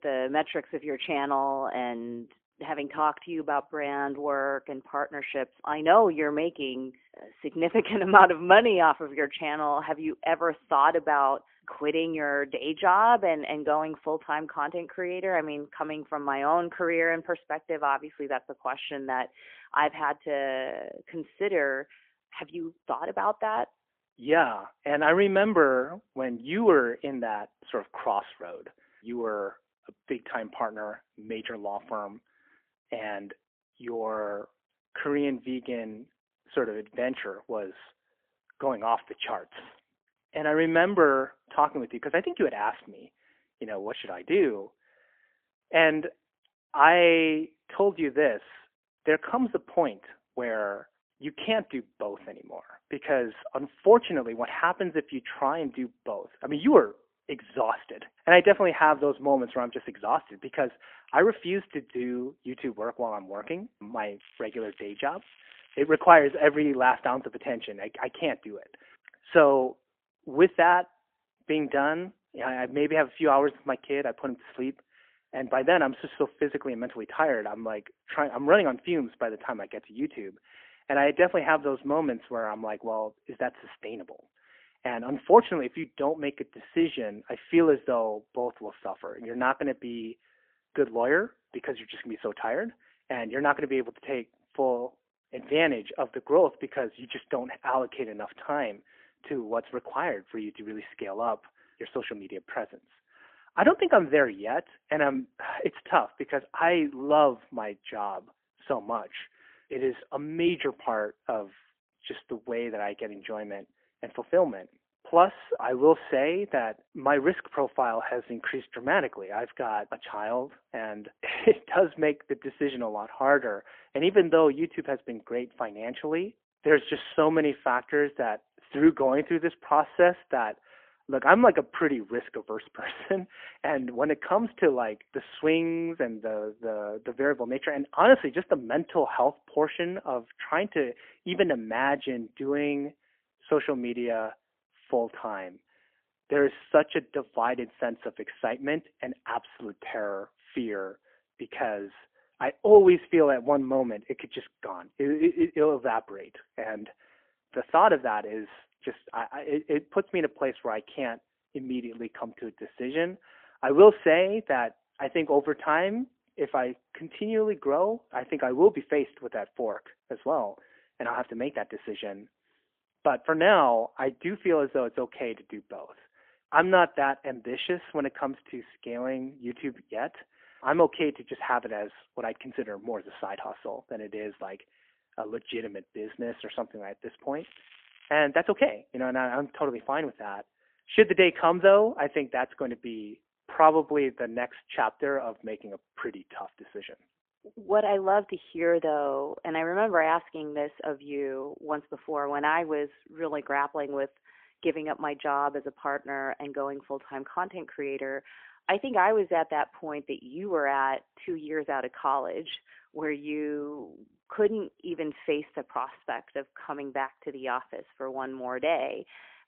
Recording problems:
phone-call audio; poor line; nothing above 3.5 kHz
crackling; faint; from 1:04 to 1:06 and at 3:07; 25 dB below the speech

